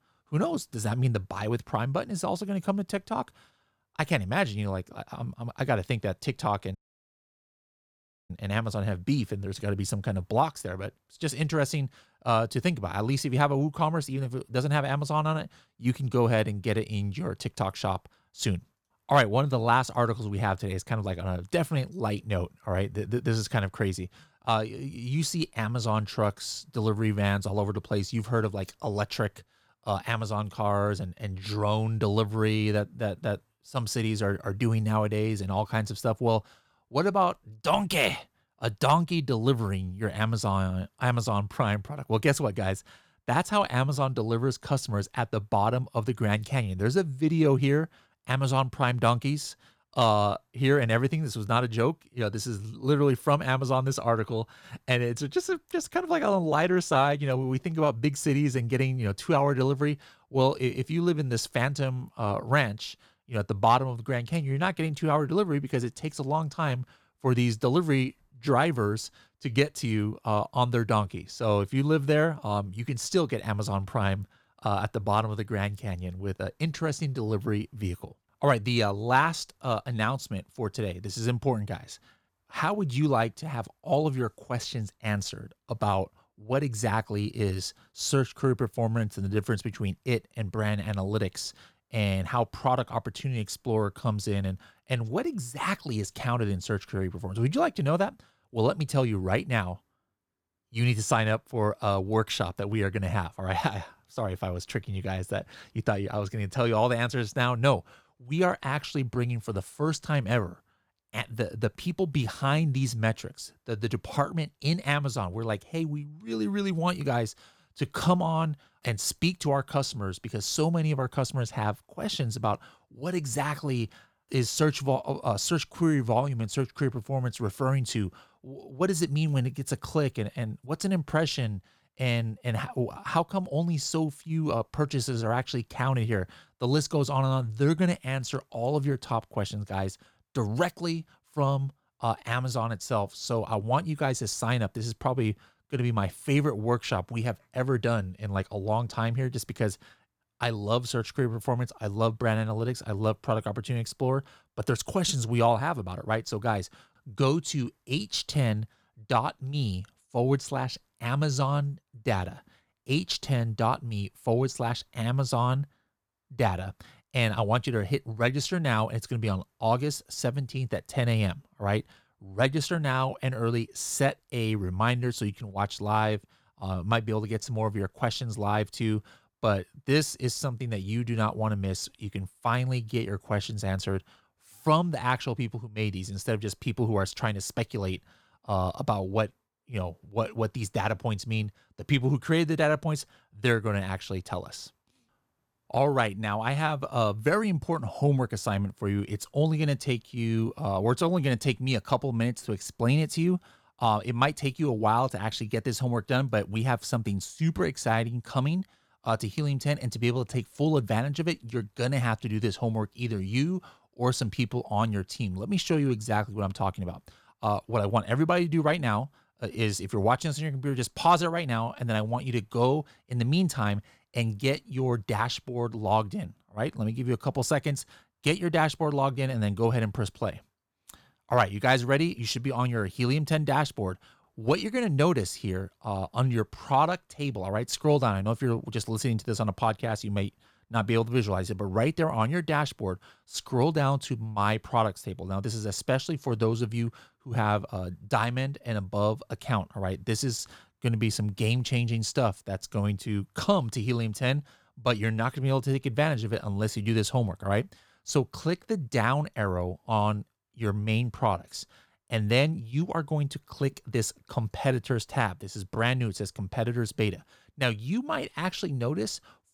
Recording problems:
audio cutting out; at 7 s for 1.5 s

